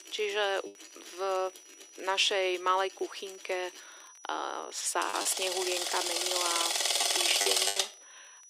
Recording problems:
thin; very; fading below 300 Hz
machinery noise; very loud; throughout; 4 dB above the speech
high-pitched whine; noticeable; throughout; 6 kHz, 20 dB below the speech
crackle, like an old record; faint; 30 dB below the speech
choppy; occasionally; 4% of the speech affected

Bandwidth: 15 kHz